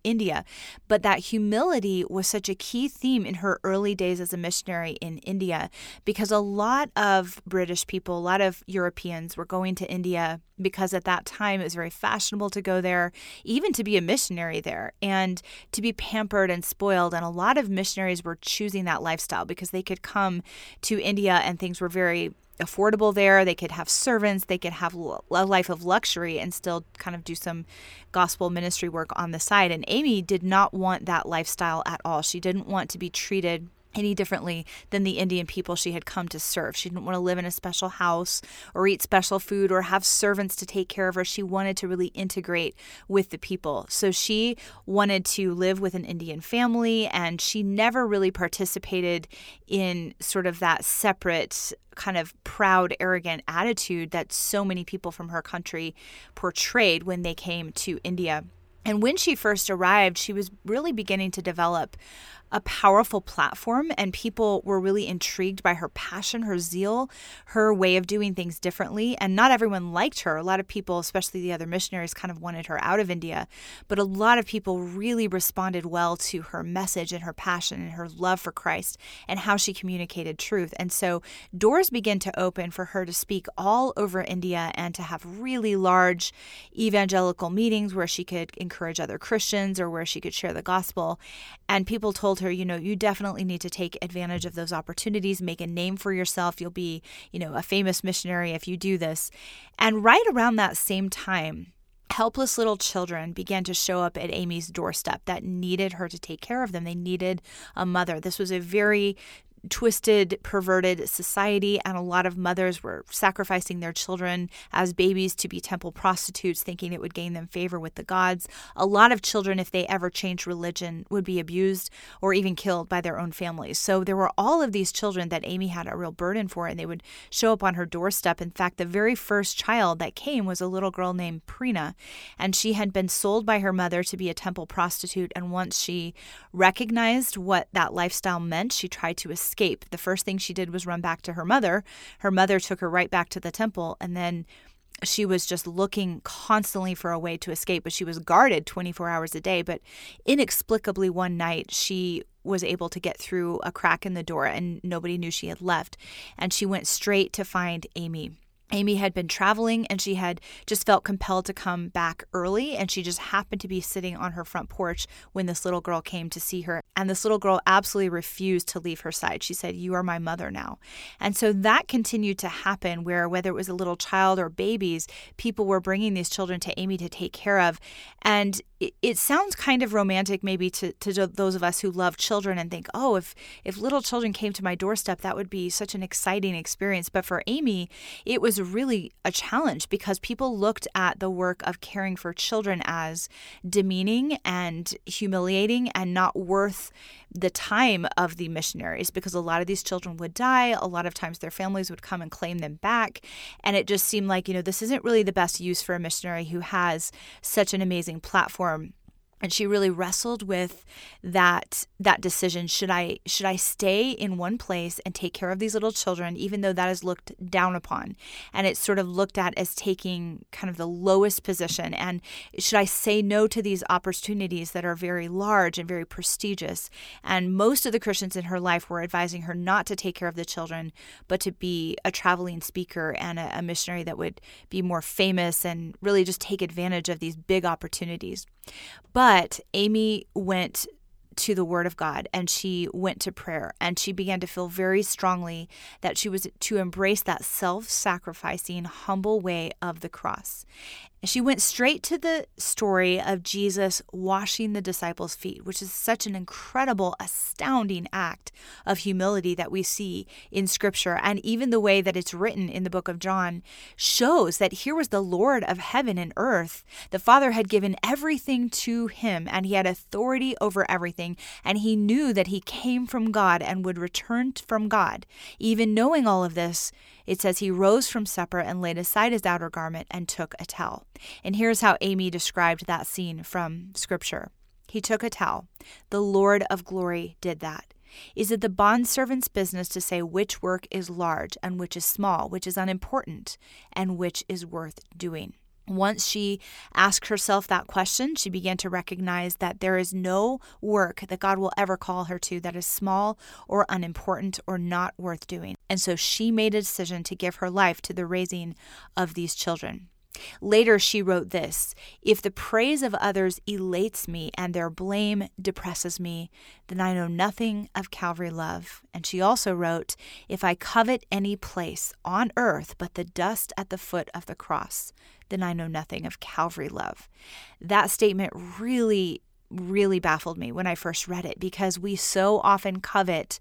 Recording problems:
none

